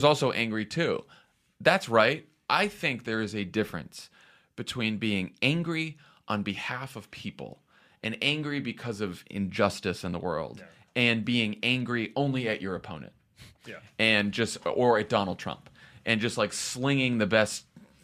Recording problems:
abrupt cut into speech; at the start

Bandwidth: 14.5 kHz